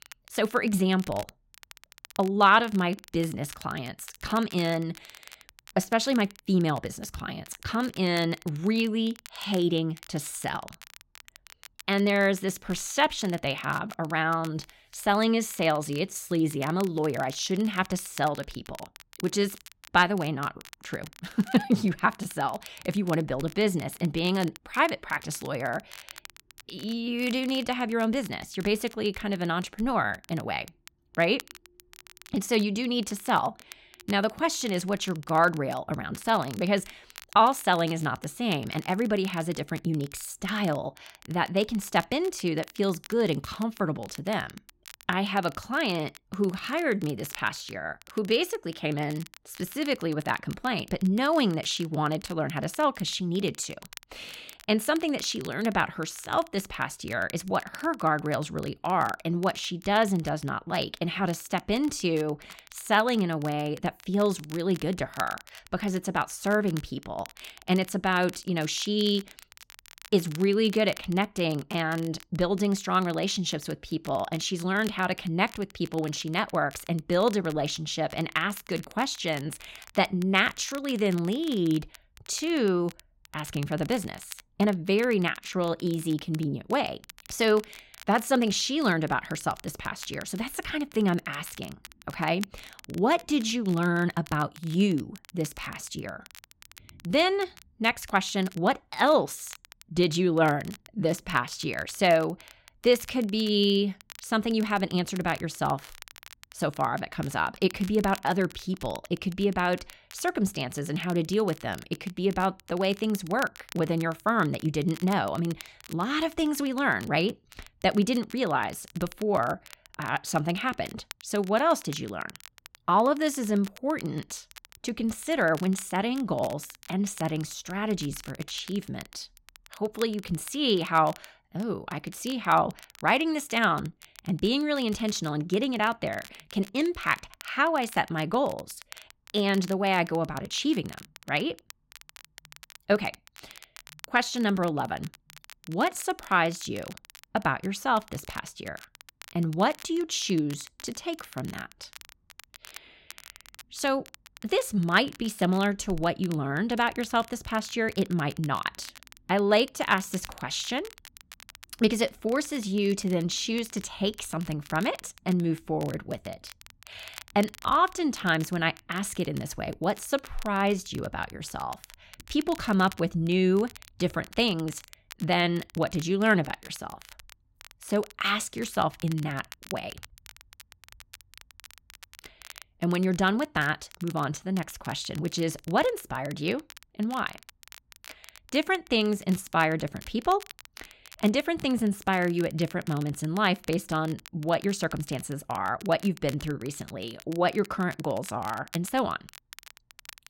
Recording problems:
crackle, like an old record; faint; 20 dB below the speech

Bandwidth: 16 kHz